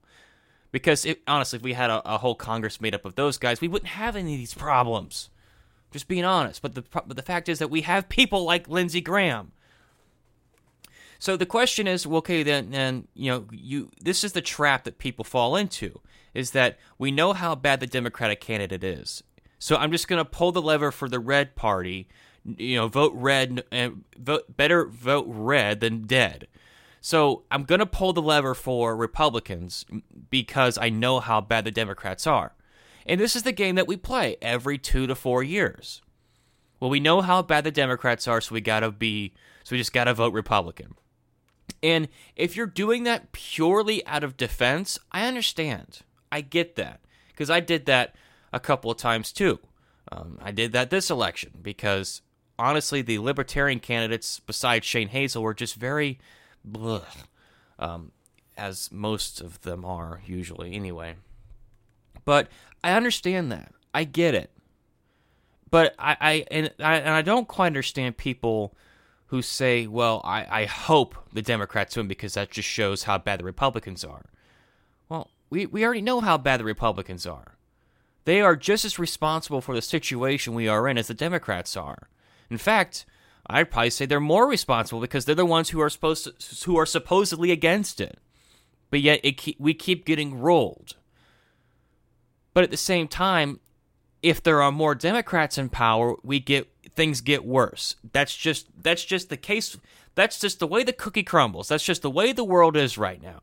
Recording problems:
none

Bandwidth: 16 kHz